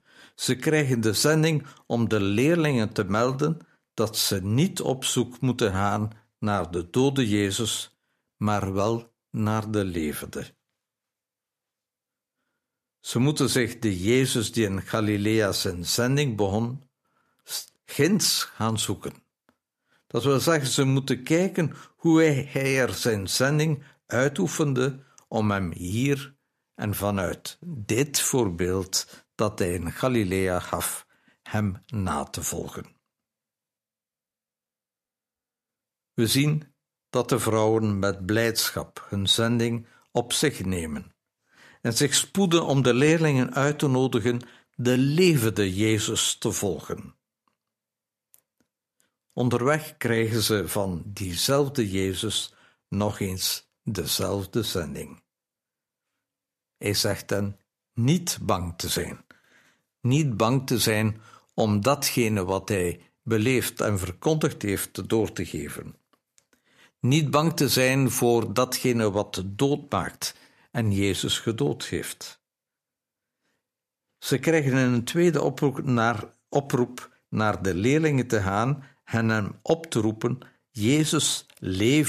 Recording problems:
abrupt cut into speech; at the end

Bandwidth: 14.5 kHz